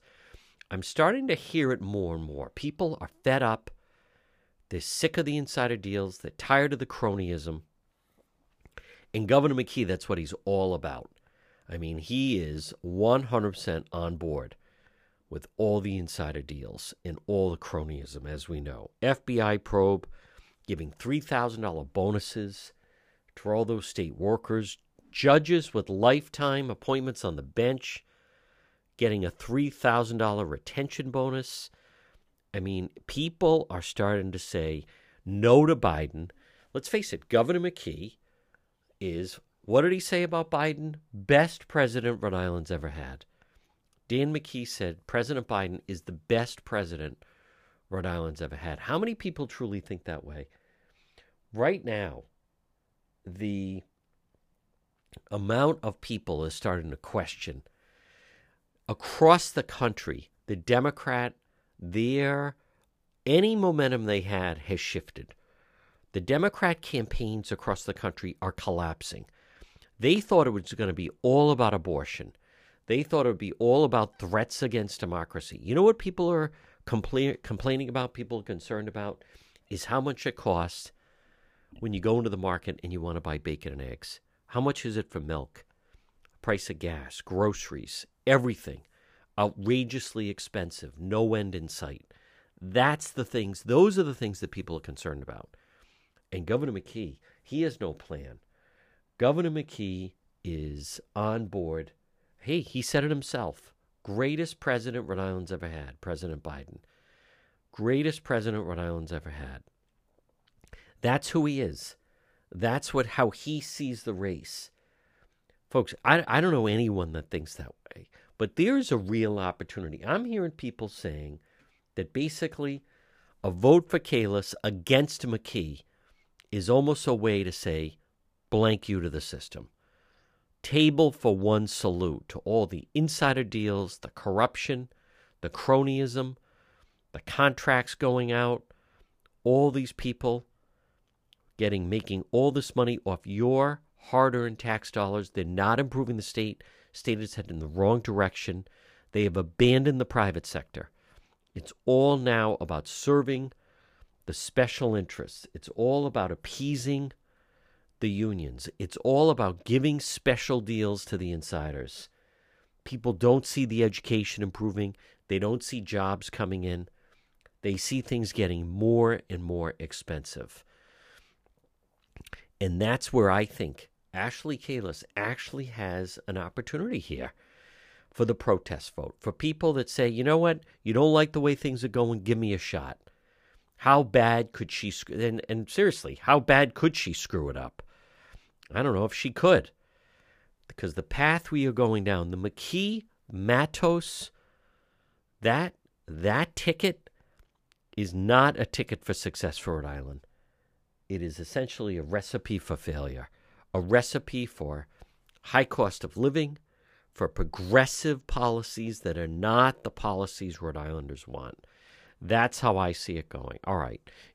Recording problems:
none

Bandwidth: 15 kHz